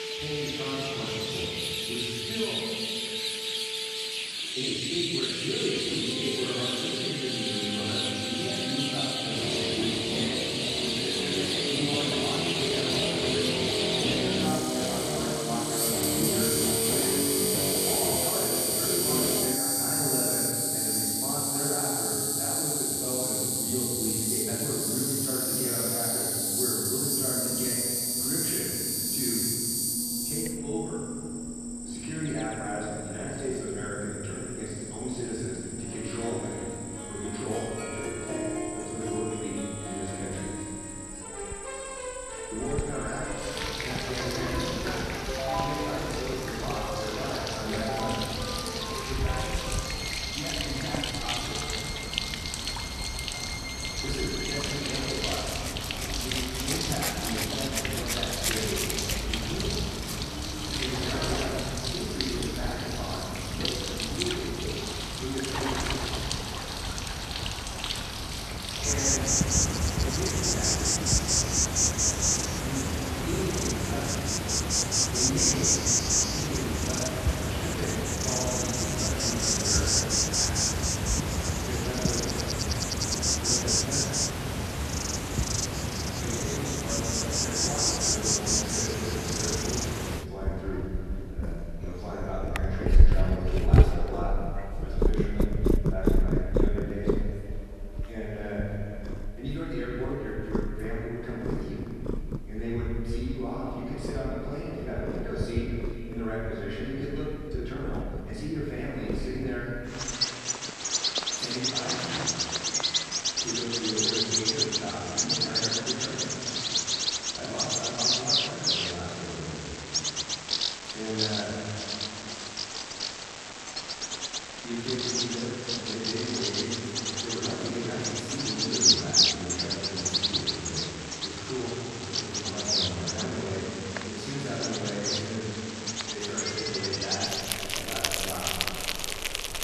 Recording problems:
room echo; strong; dies away in 2.4 s
off-mic speech; far
echo of what is said; noticeable; from 1:30 on; 450 ms later, 20 dB below the speech
animal sounds; very loud; throughout; 7 dB above the speech
background music; very loud; until 1:01; as loud as the speech
uneven, jittery; strongly; from 4.5 s to 2:17

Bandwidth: 13.5 kHz